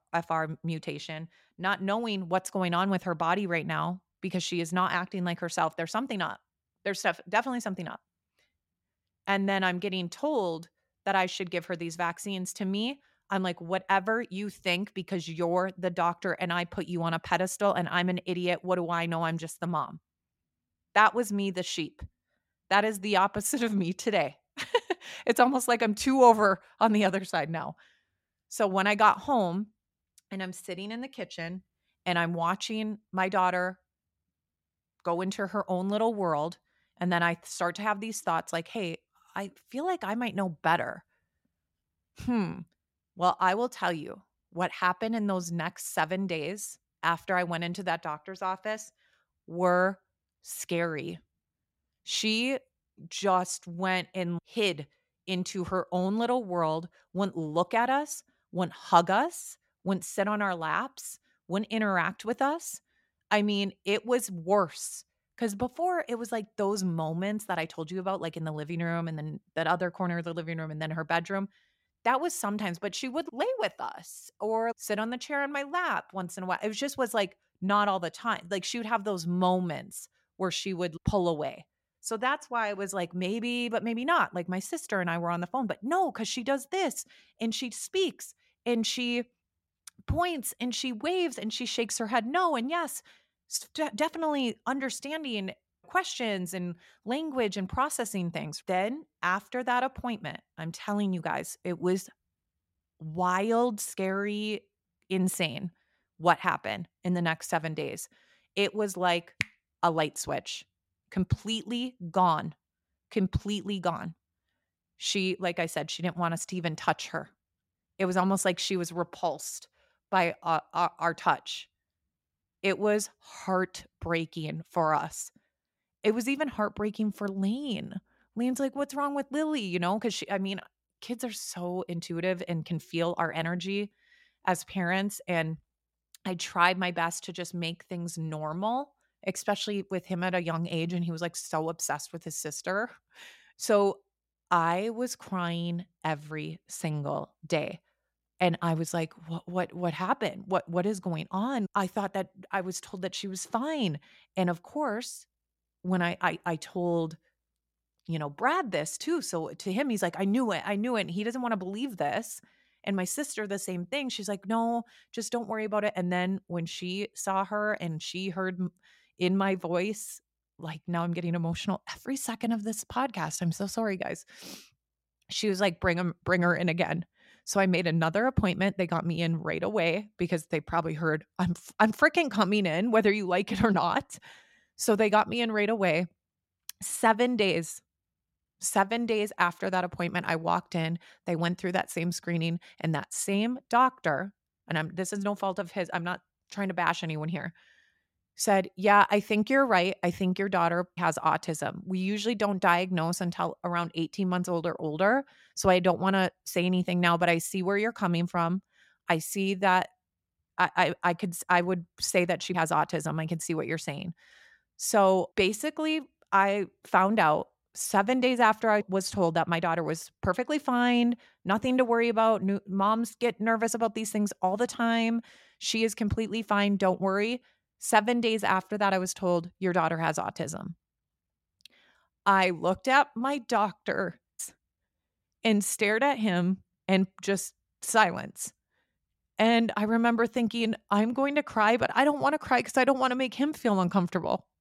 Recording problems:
none

